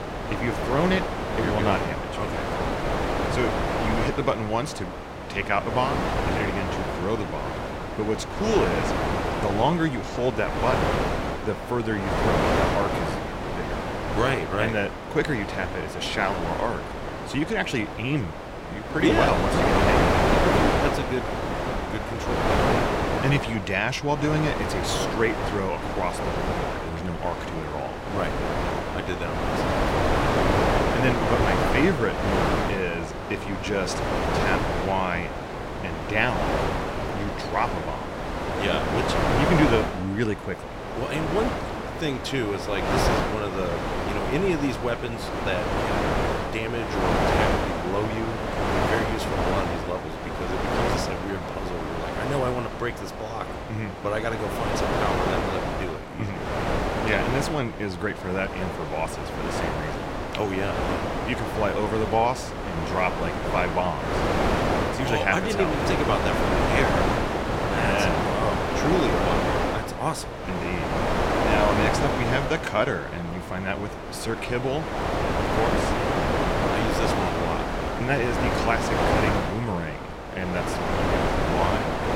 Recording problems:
wind noise on the microphone; heavy; 2 dB above the speech

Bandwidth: 16 kHz